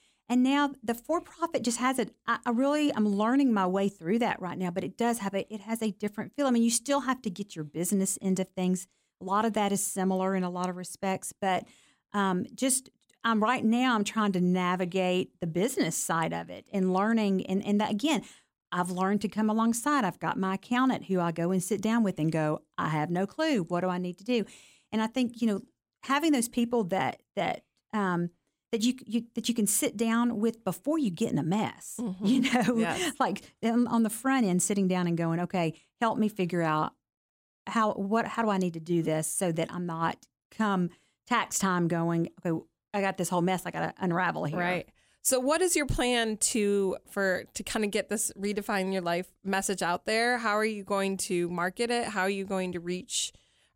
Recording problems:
none

